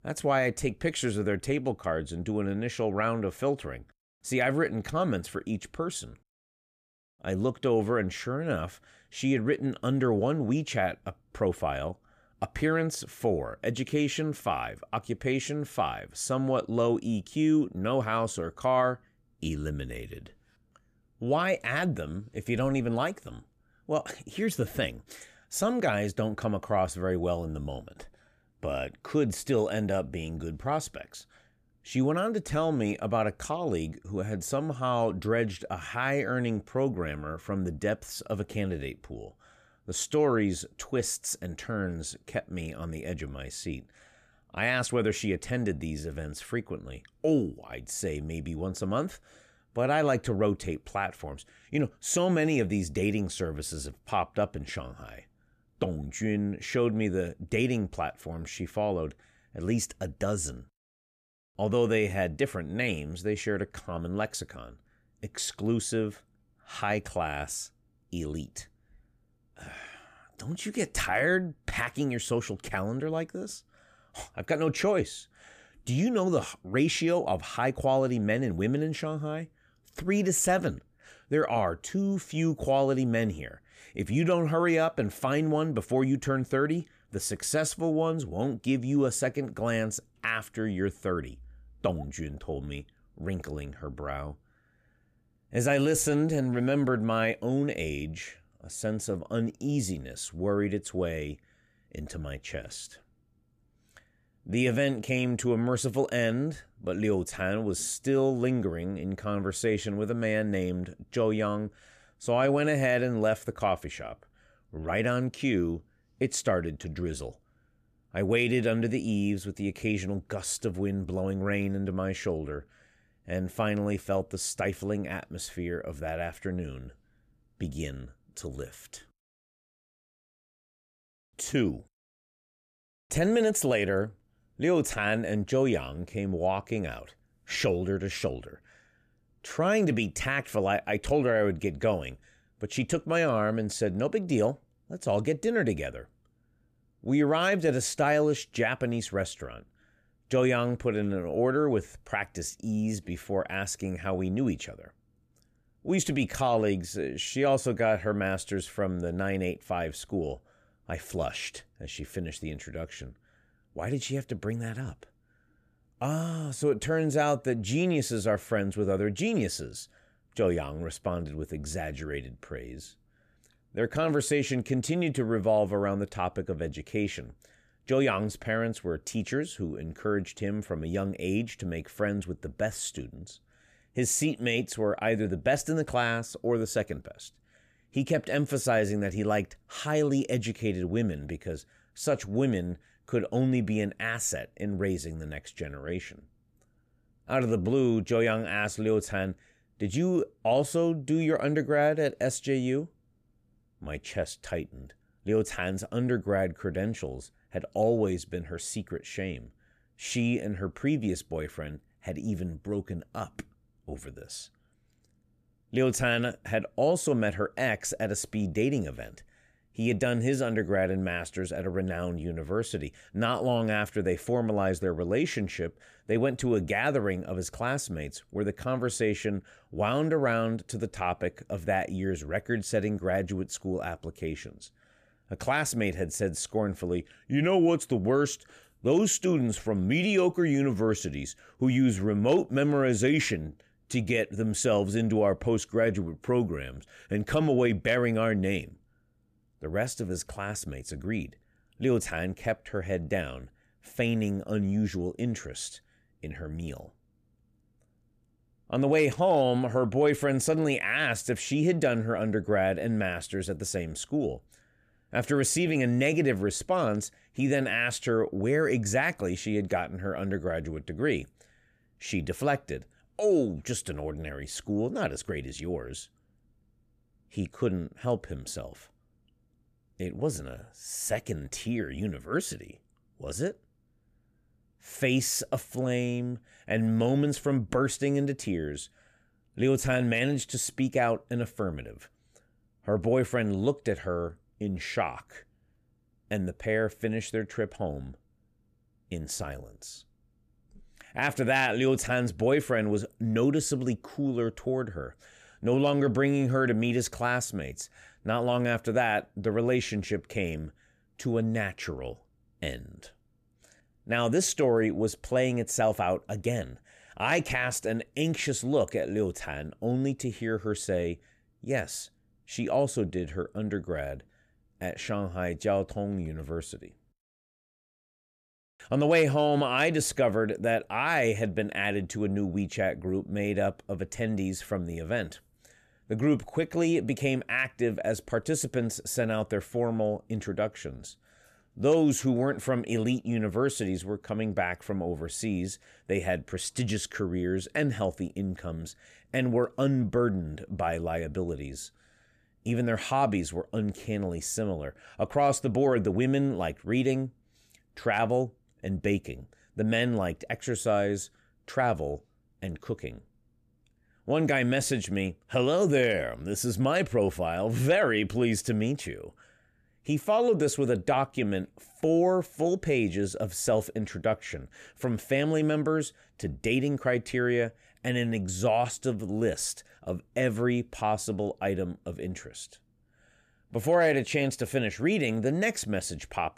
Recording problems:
none

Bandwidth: 14.5 kHz